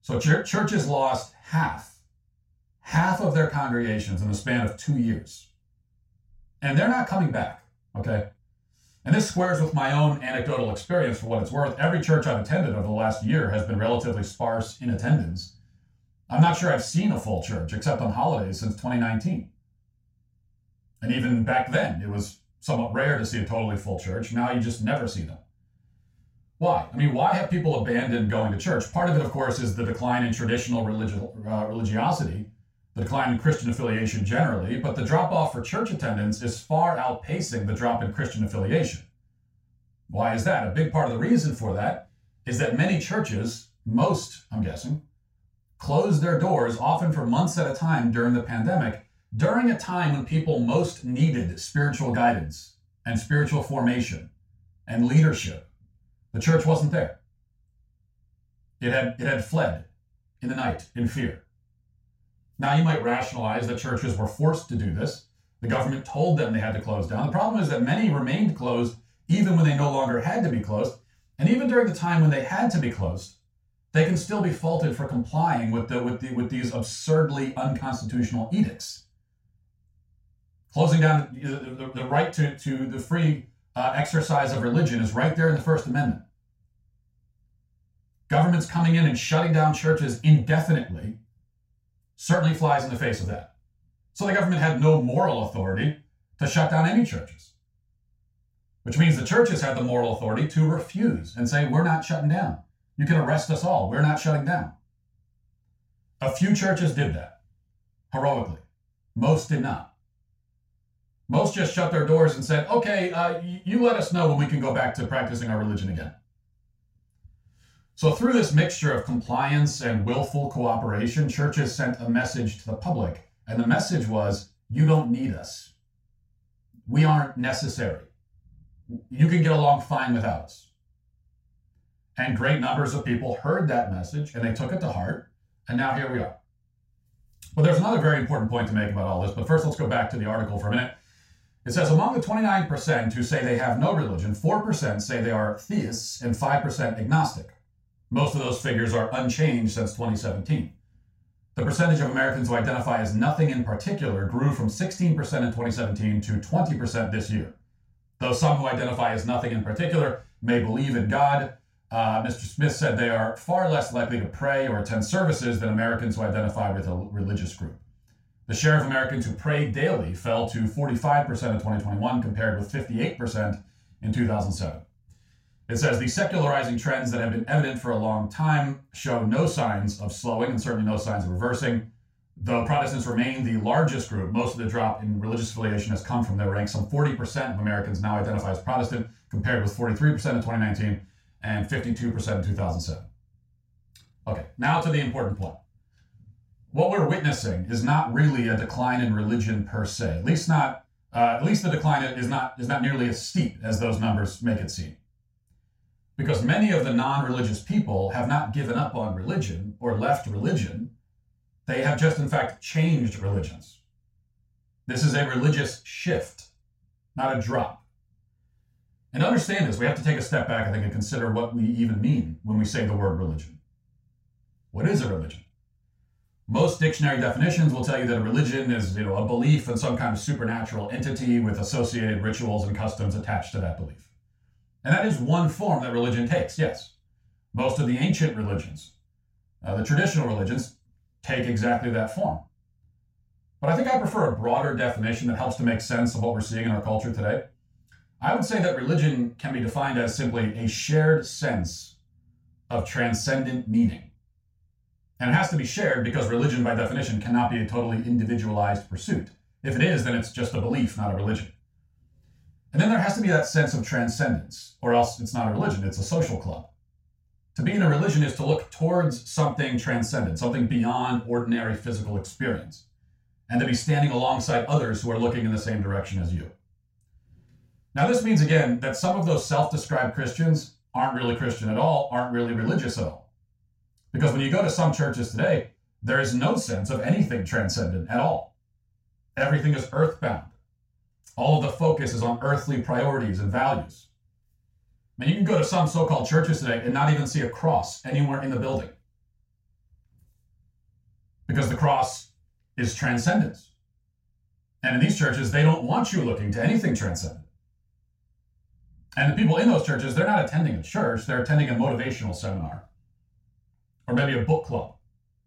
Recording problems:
off-mic speech; far
room echo; slight; dies away in 0.3 s

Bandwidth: 16 kHz